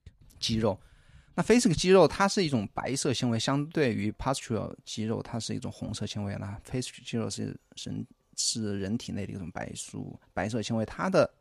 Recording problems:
none

